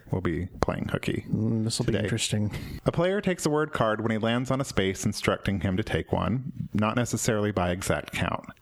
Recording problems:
squashed, flat; somewhat

